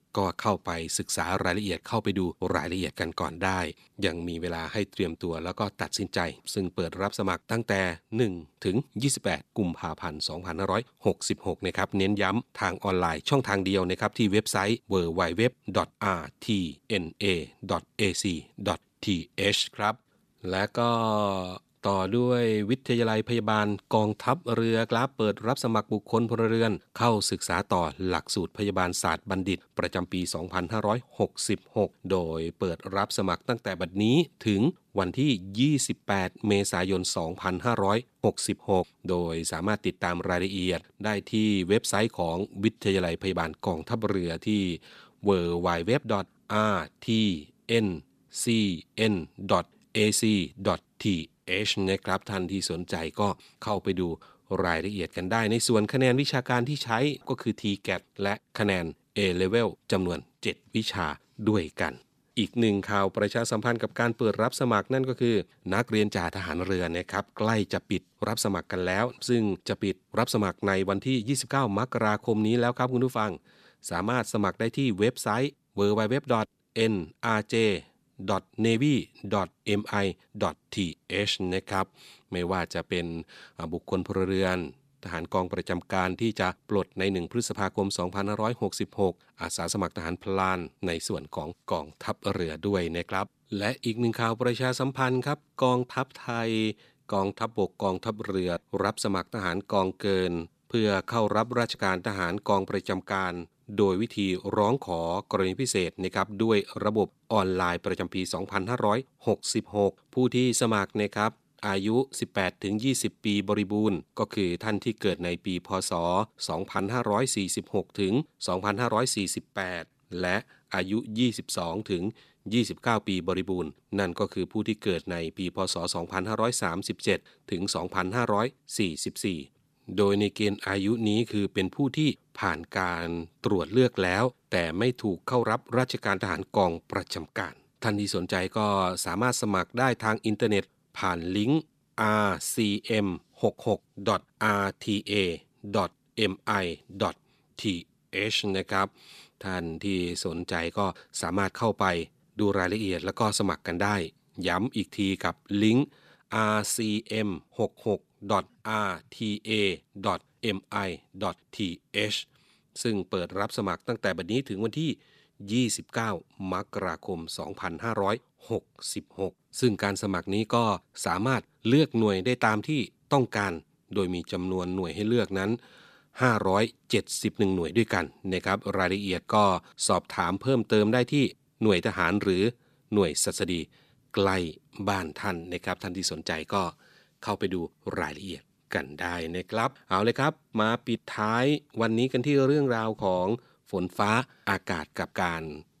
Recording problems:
none

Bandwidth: 14.5 kHz